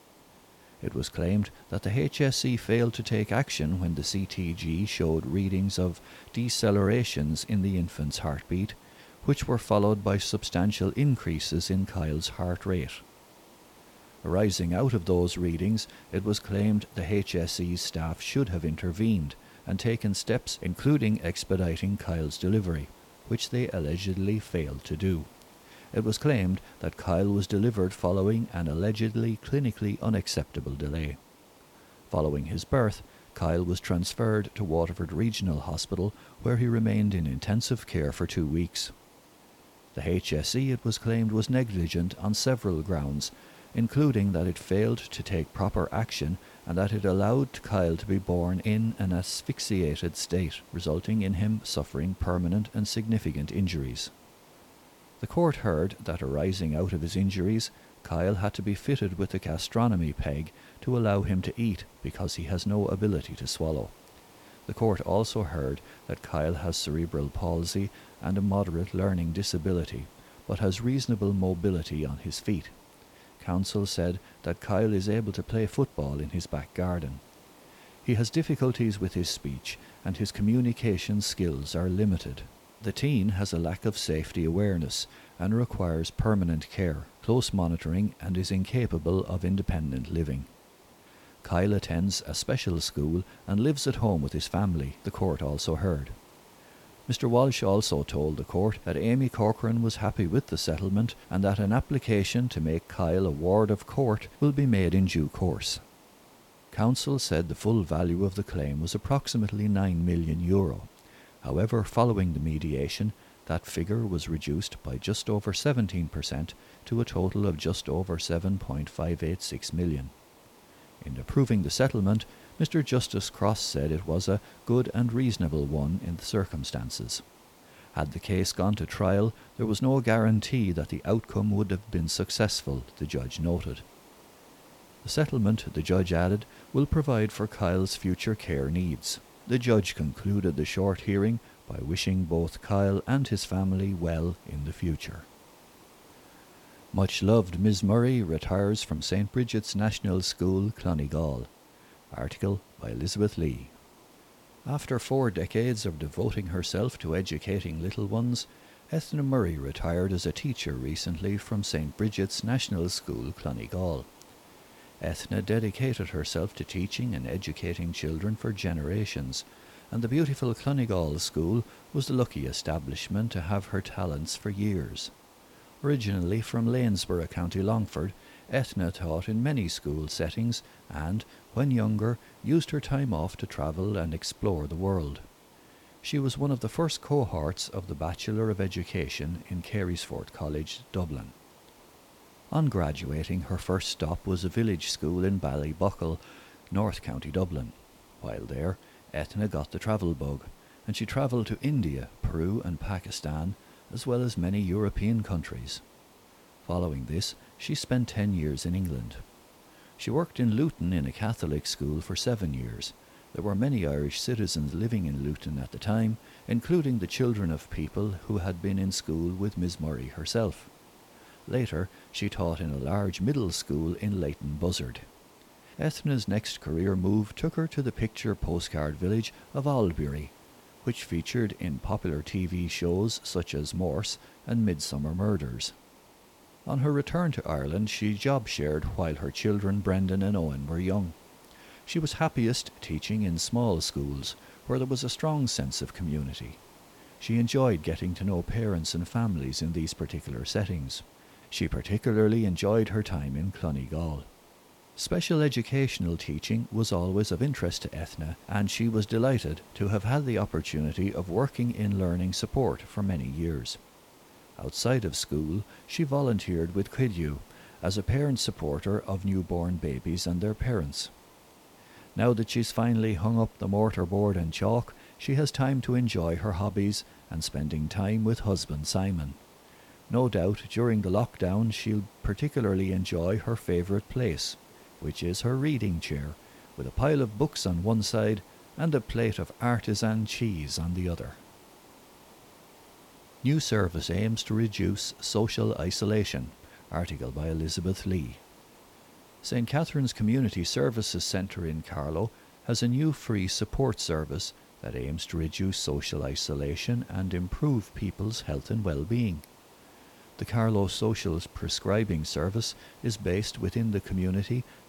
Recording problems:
hiss; faint; throughout; 25 dB below the speech

